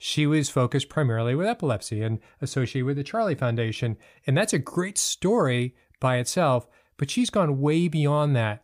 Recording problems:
none

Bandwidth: 15 kHz